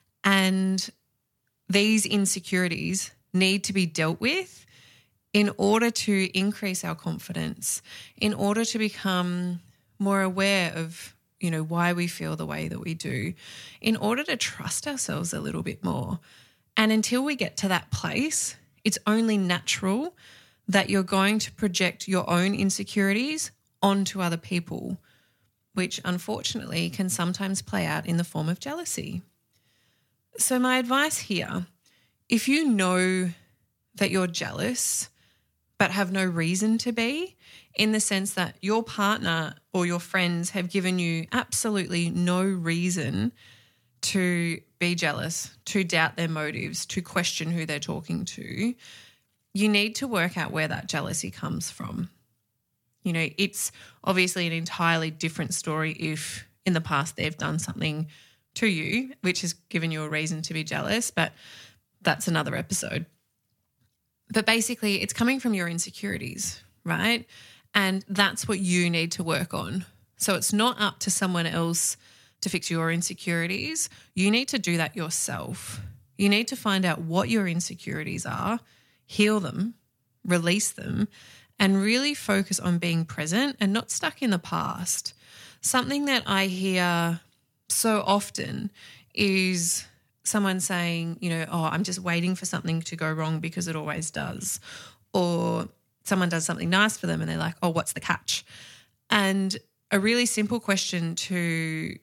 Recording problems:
uneven, jittery; strongly; from 2.5 s to 1:38

